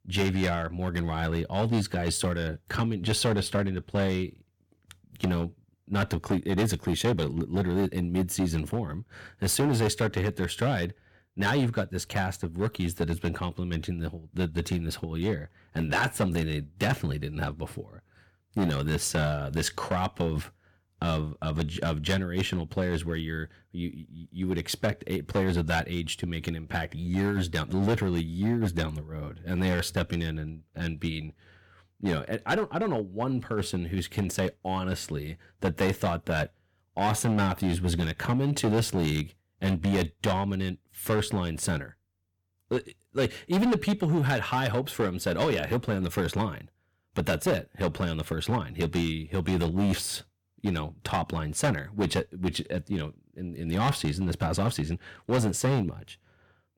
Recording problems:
distortion; heavy; 7% of the sound clipped

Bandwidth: 18 kHz